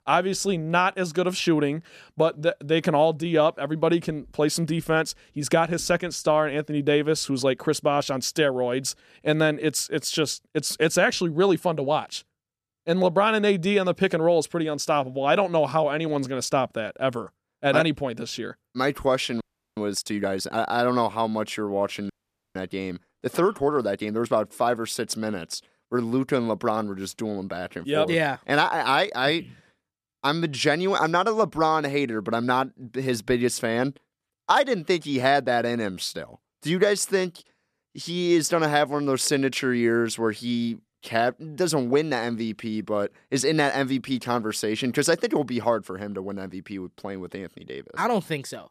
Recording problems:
audio freezing; at 19 s and at 22 s

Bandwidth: 14.5 kHz